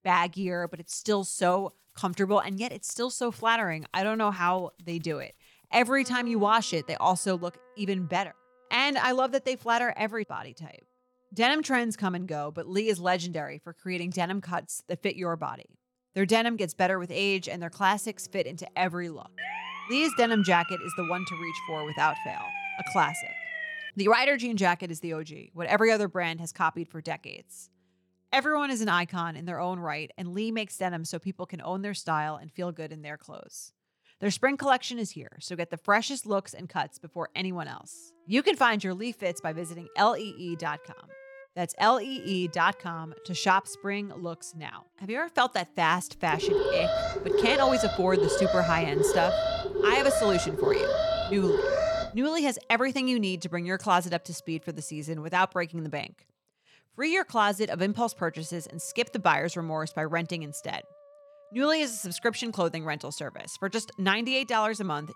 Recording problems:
background music; faint; throughout; 30 dB below the speech
siren; noticeable; from 19 to 24 s; peak 5 dB below the speech
alarm; loud; from 46 to 52 s; peak 3 dB above the speech

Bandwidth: 18 kHz